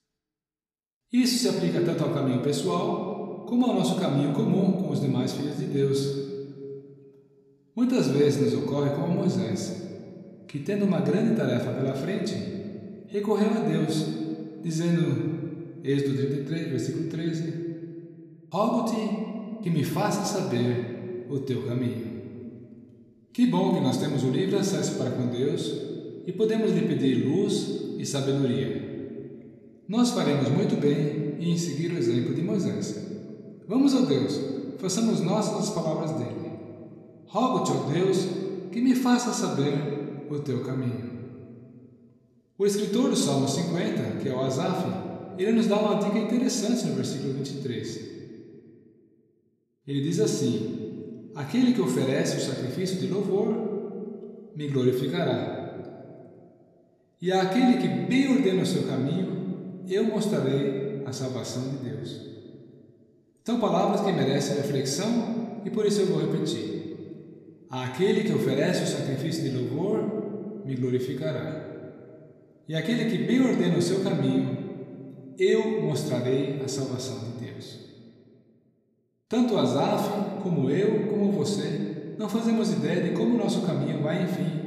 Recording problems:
room echo; noticeable; dies away in 1.8 s
off-mic speech; somewhat distant

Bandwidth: 14.5 kHz